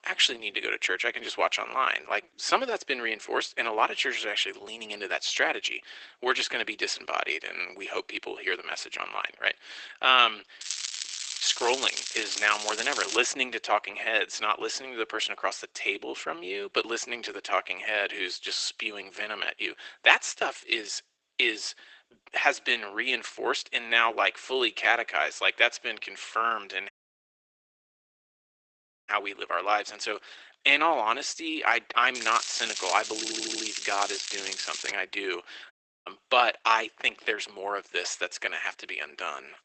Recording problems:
garbled, watery; badly; nothing above 8 kHz
thin; very; fading below 350 Hz
crackling; loud; from 11 to 13 s and from 32 to 35 s; 5 dB below the speech
audio cutting out; at 27 s for 2 s and at 36 s
audio stuttering; at 33 s

